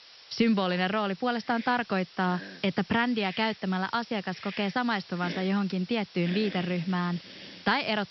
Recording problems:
high frequencies cut off; noticeable; nothing above 5.5 kHz
hiss; noticeable; throughout; 15 dB below the speech

